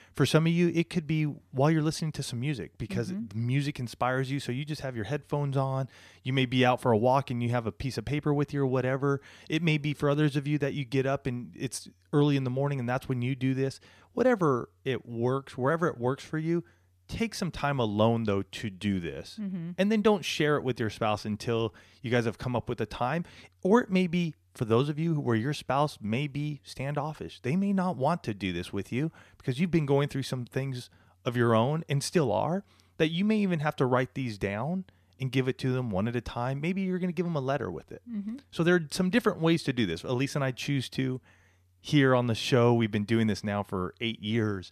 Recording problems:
none

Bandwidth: 14.5 kHz